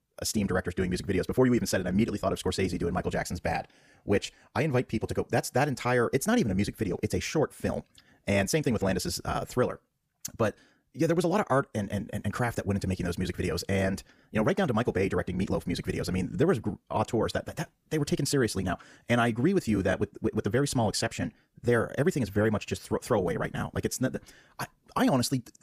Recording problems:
wrong speed, natural pitch; too fast; 1.6 times normal speed

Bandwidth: 15 kHz